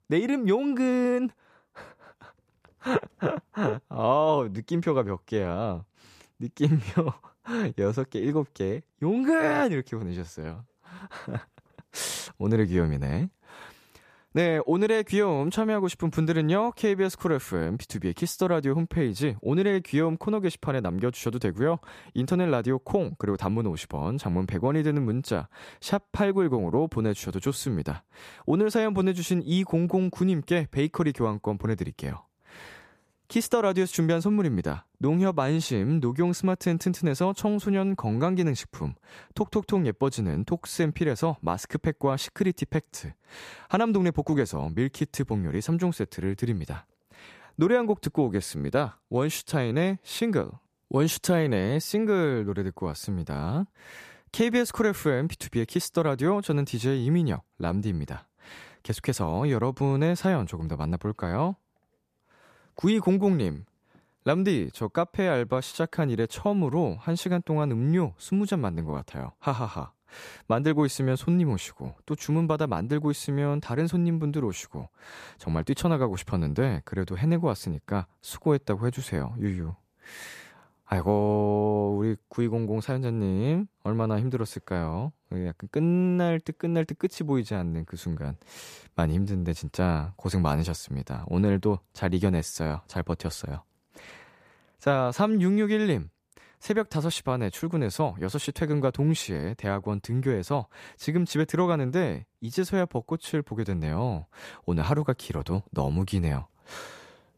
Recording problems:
none

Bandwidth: 14.5 kHz